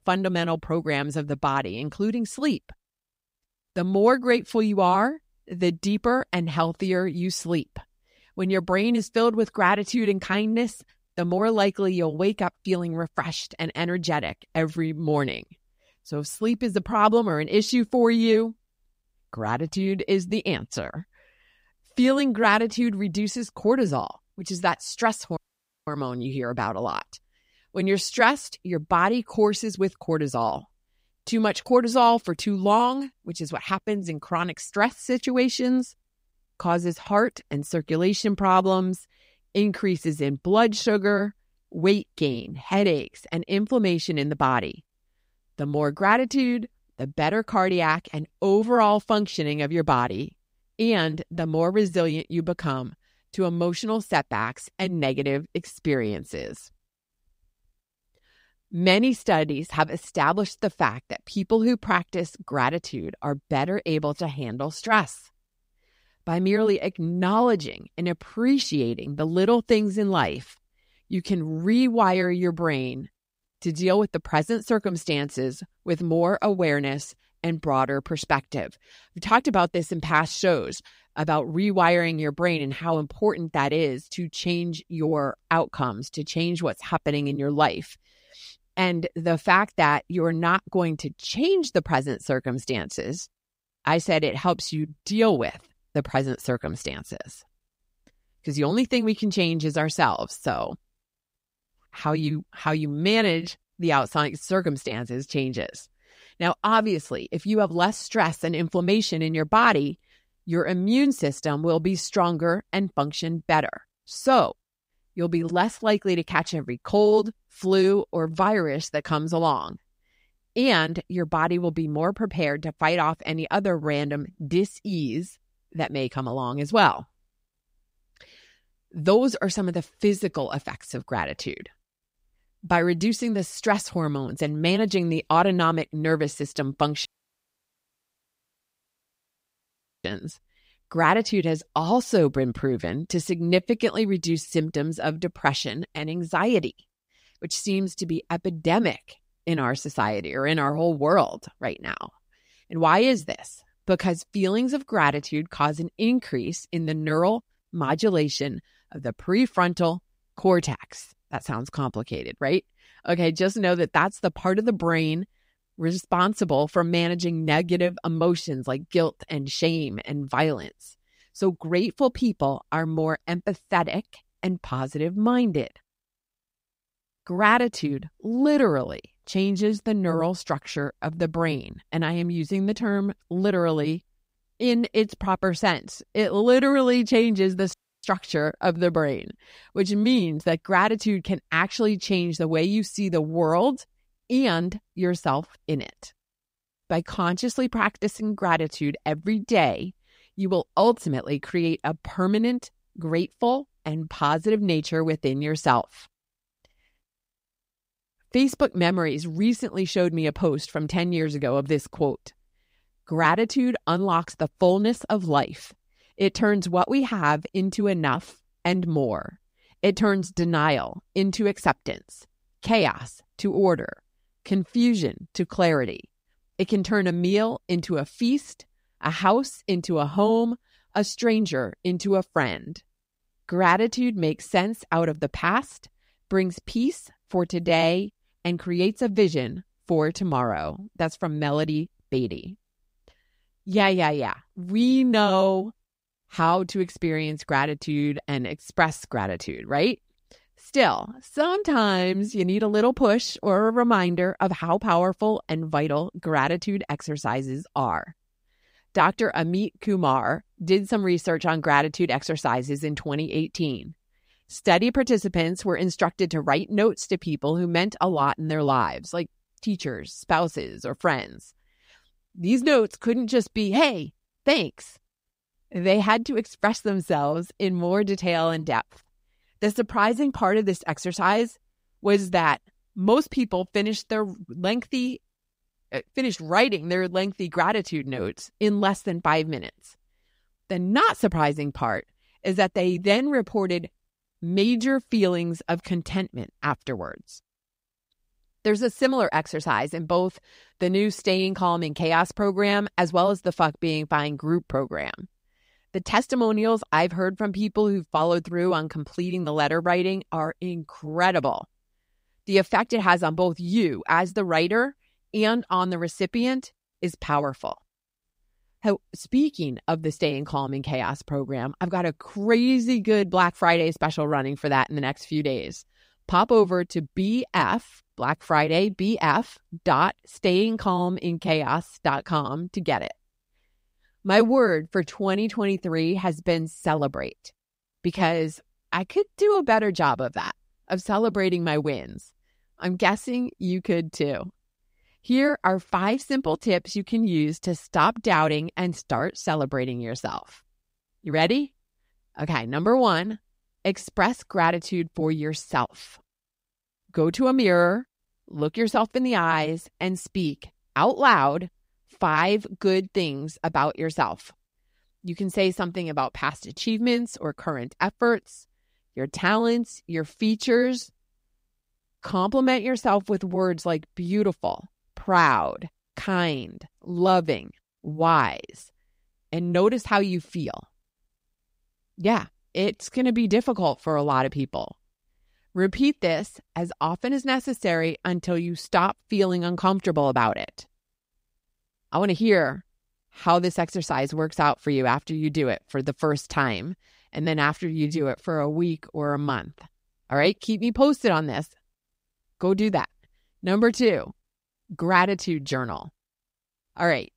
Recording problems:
audio cutting out; at 25 s for 0.5 s, at 2:17 for 3 s and at 3:08

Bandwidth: 15.5 kHz